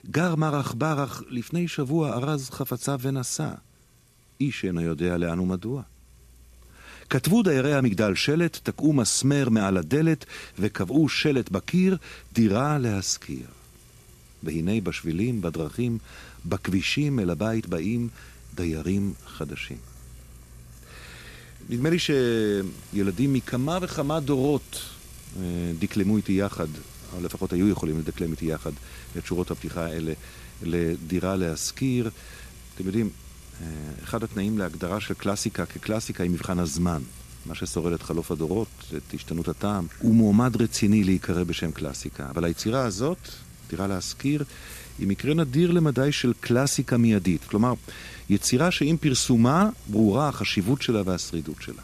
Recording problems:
household noises; faint; throughout; 20 dB below the speech

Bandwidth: 14 kHz